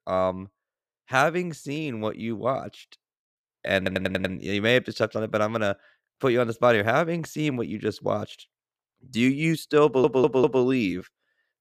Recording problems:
audio stuttering; at 4 s and at 10 s

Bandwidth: 14.5 kHz